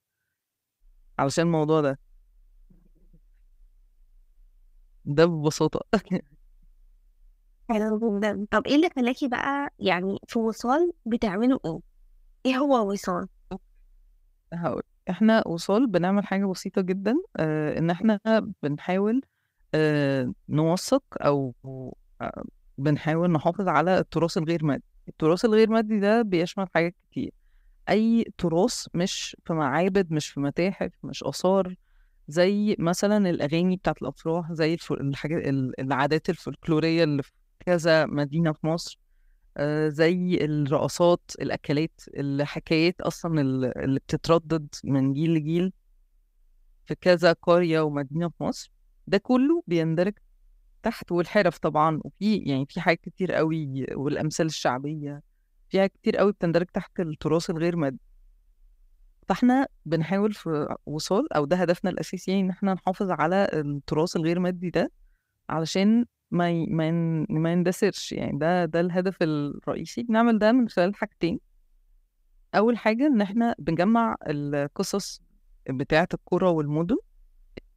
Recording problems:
none

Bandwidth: 15.5 kHz